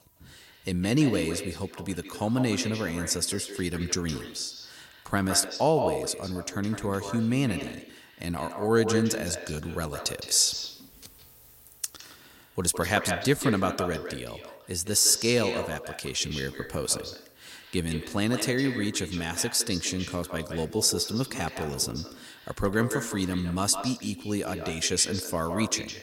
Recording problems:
echo of what is said; strong; throughout; 160 ms later, 9 dB below the speech

